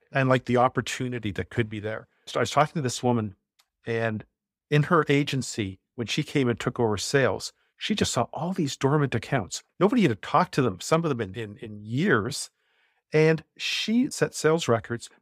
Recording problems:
none

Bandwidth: 15.5 kHz